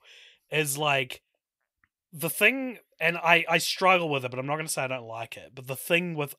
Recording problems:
none

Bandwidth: 15.5 kHz